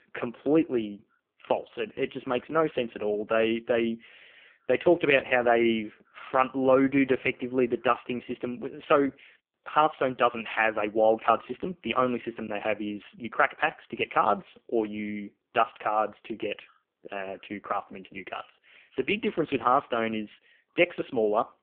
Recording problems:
phone-call audio; poor line

